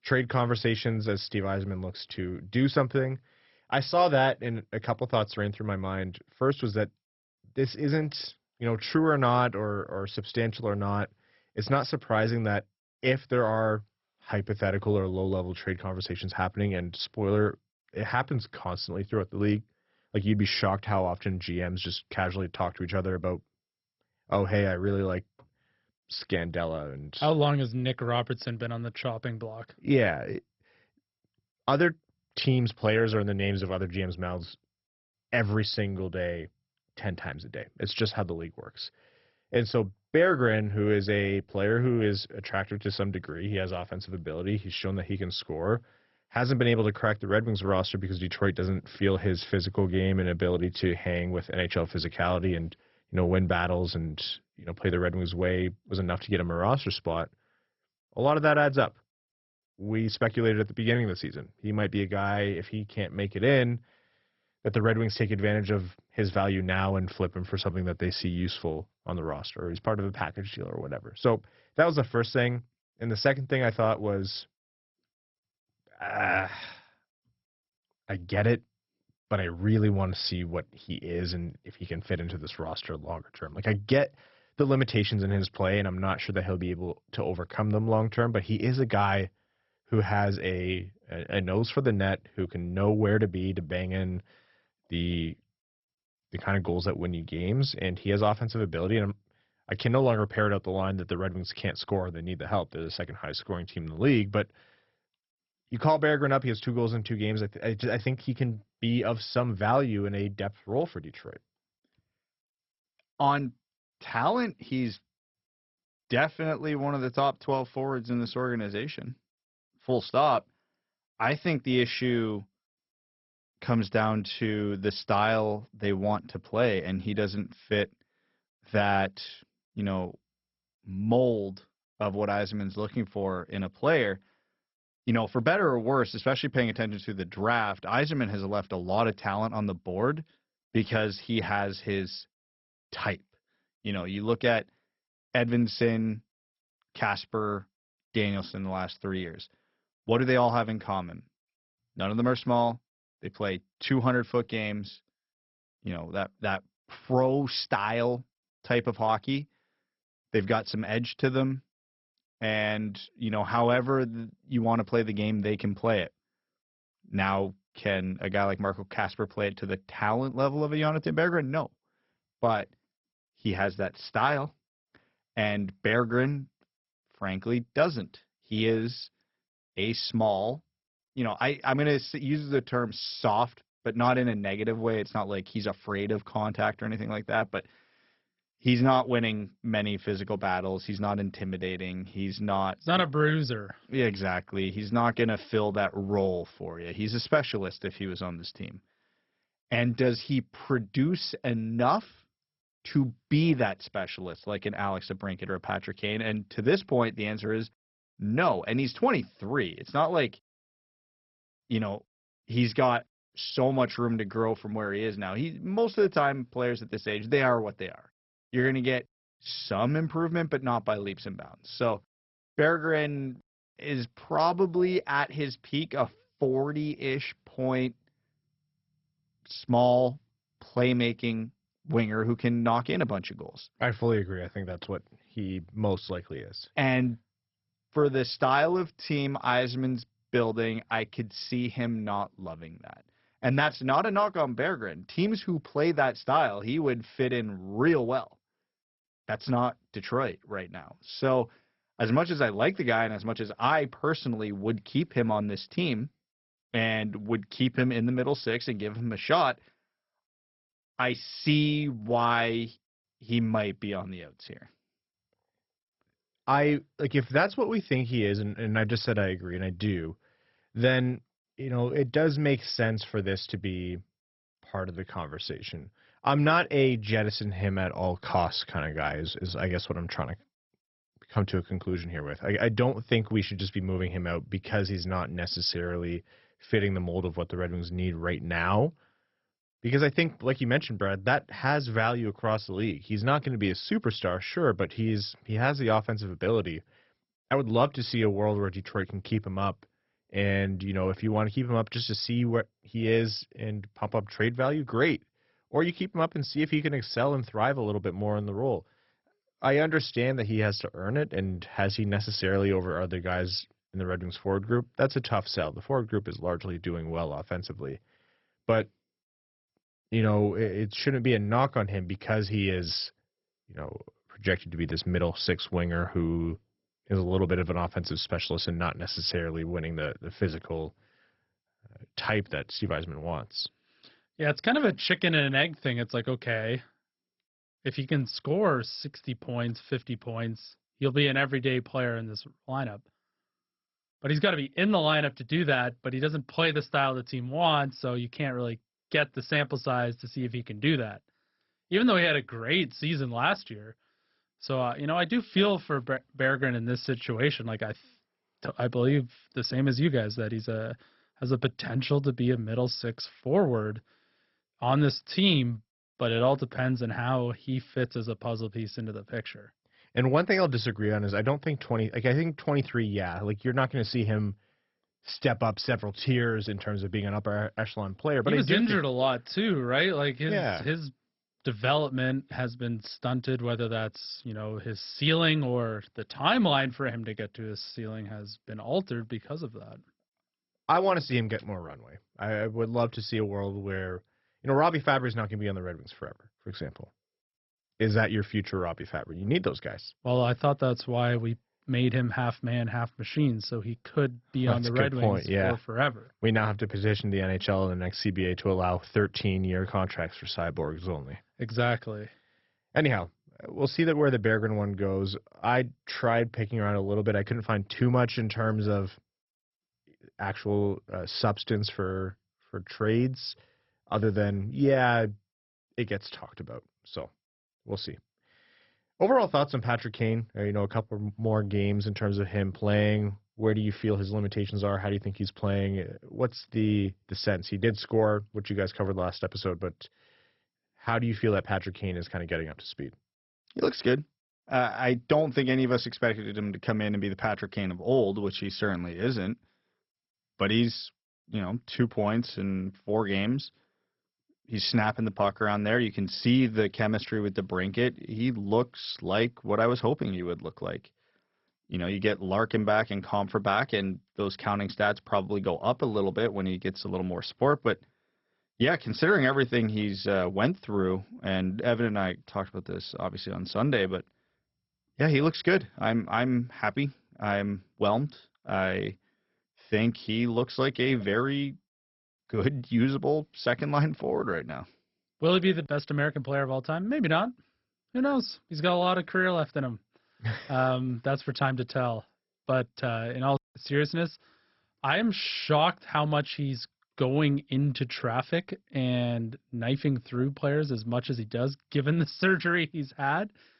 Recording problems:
garbled, watery; badly; nothing above 5.5 kHz

